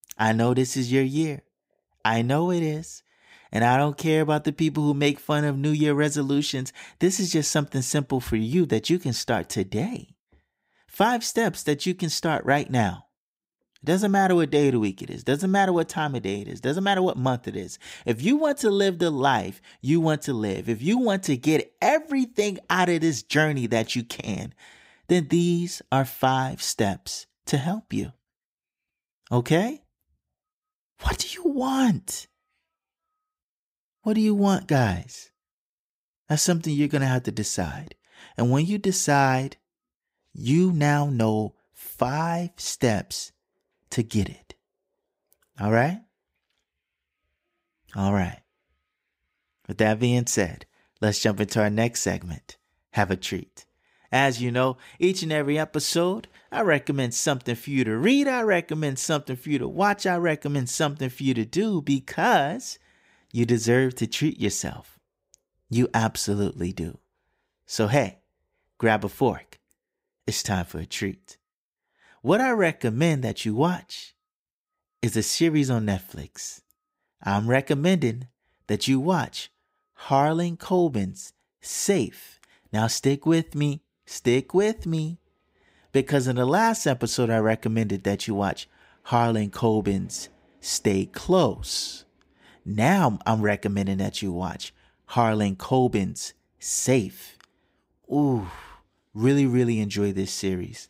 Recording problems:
none

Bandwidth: 15.5 kHz